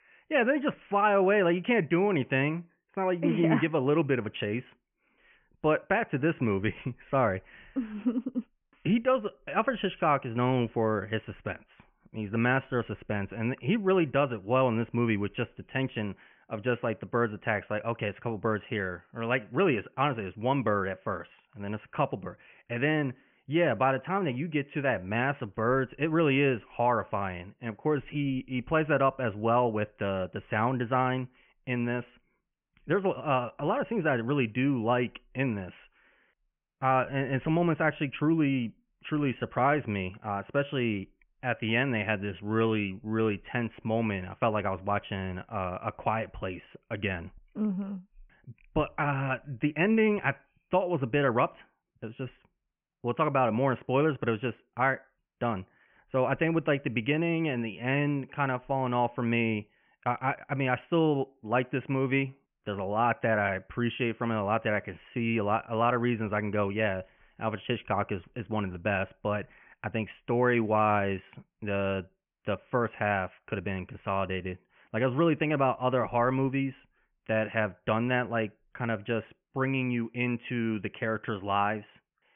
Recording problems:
high frequencies cut off; severe; nothing above 3 kHz

